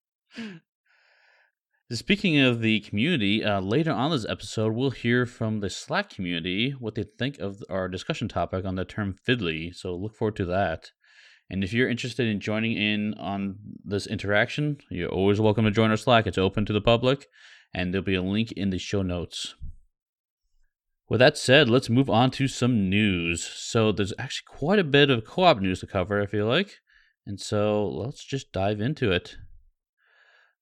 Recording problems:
uneven, jittery; slightly; from 5 to 25 s

